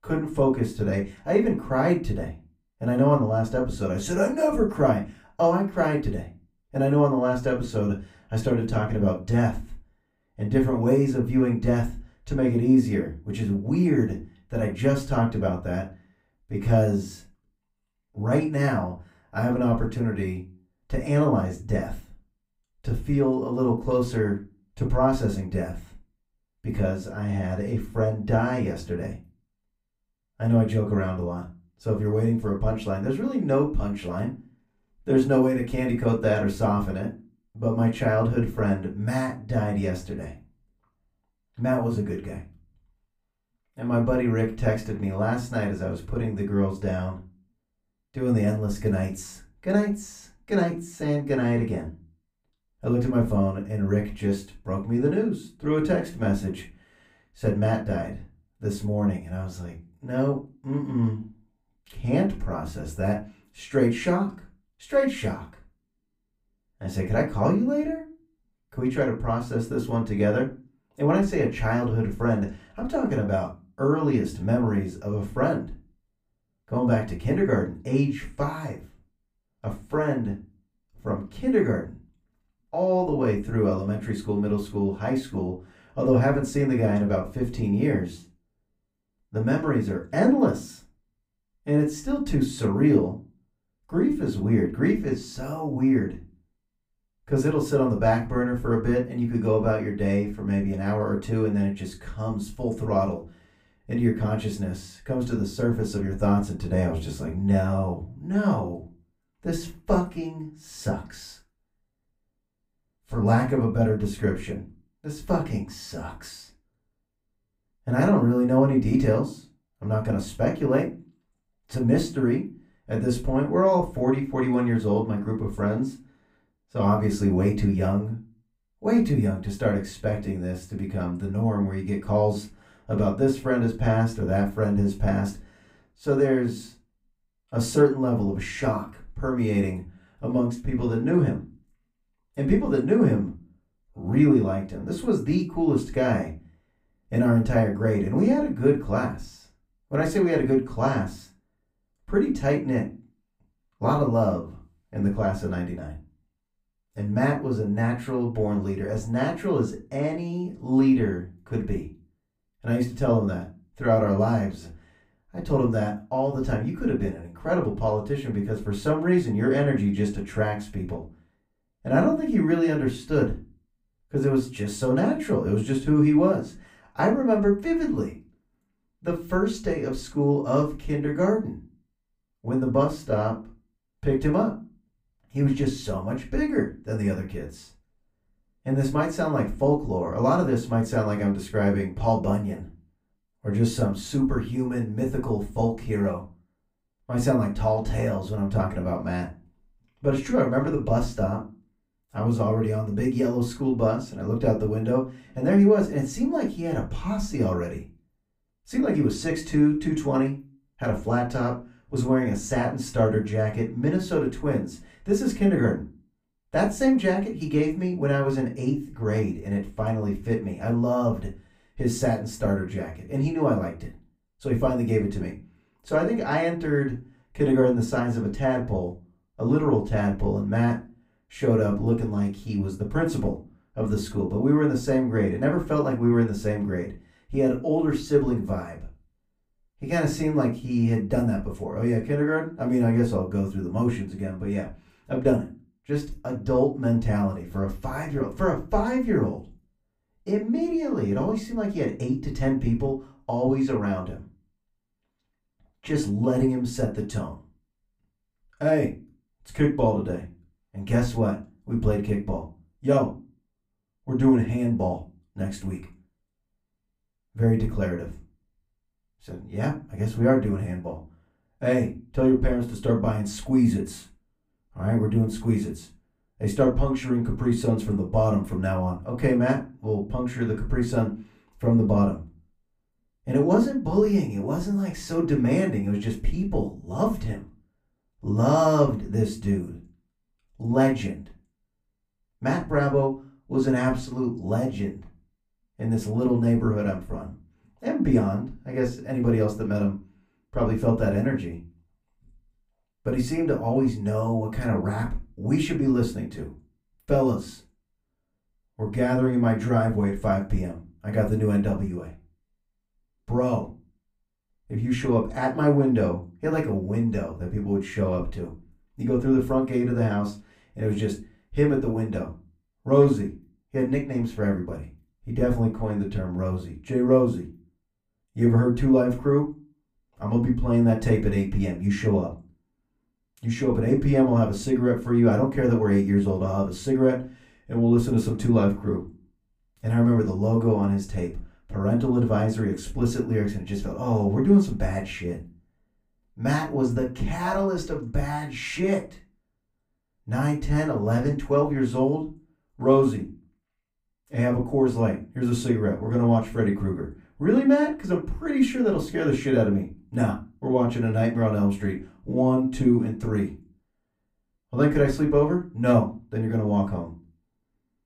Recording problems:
off-mic speech; far
room echo; very slight; dies away in 0.3 s

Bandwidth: 15.5 kHz